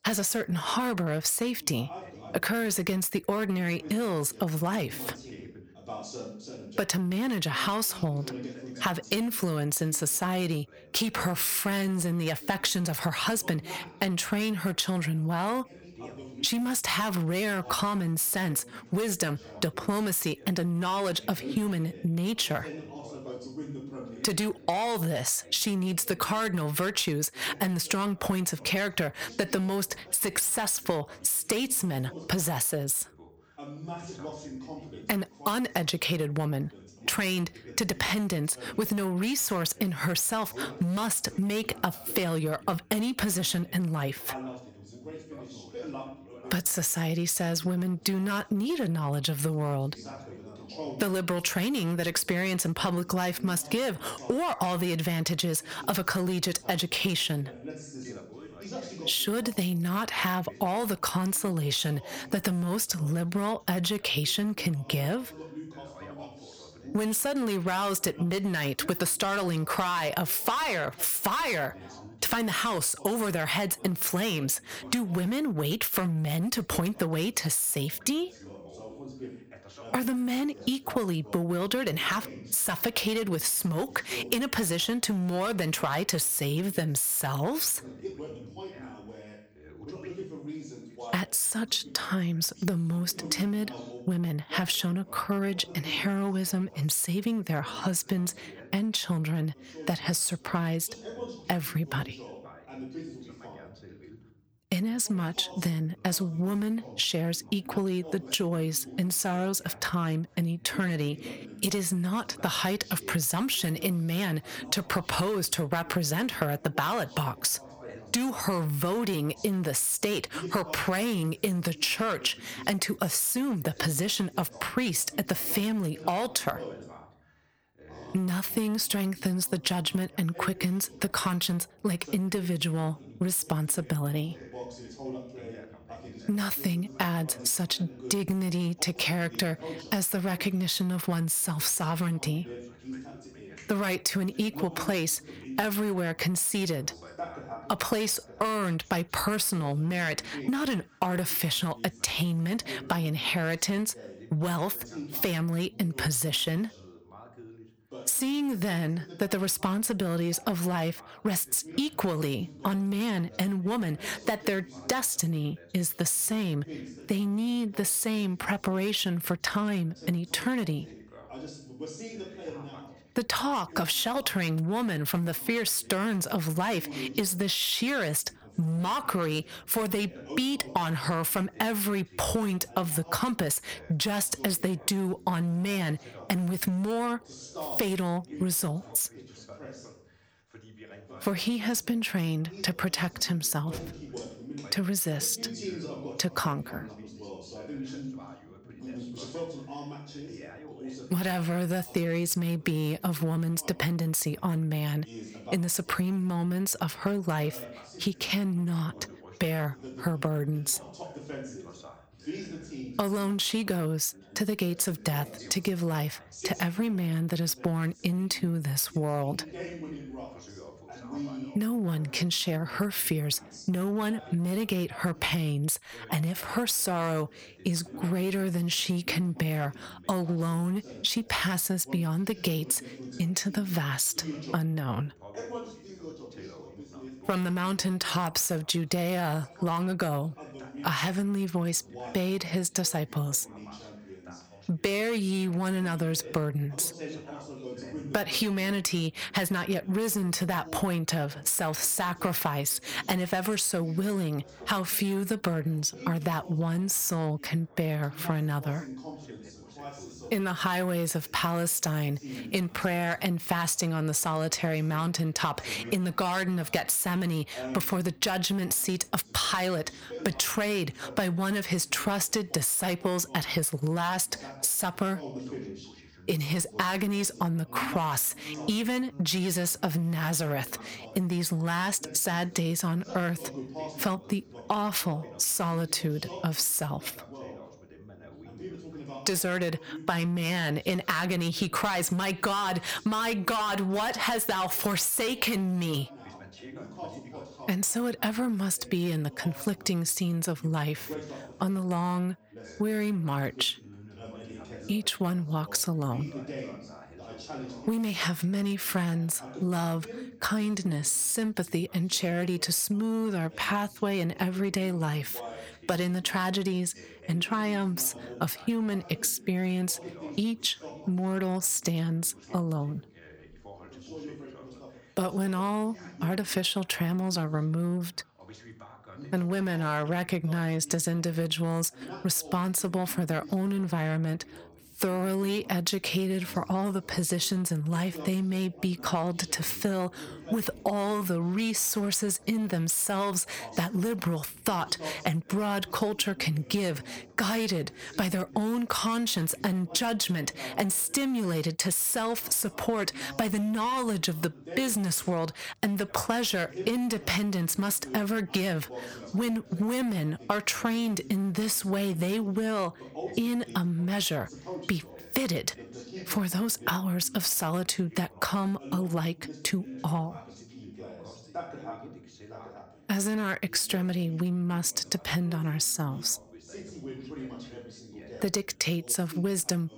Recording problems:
distortion; slight; 5% of the sound clipped
squashed, flat; somewhat, background pumping
background chatter; noticeable; throughout; 2 voices, 15 dB below the speech

